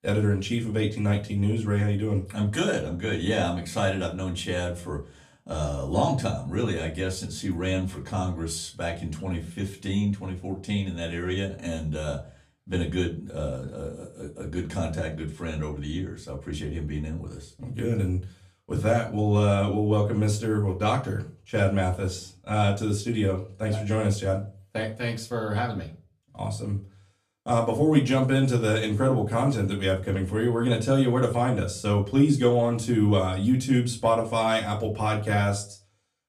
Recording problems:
off-mic speech; far
room echo; very slight; dies away in 0.3 s

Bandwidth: 14.5 kHz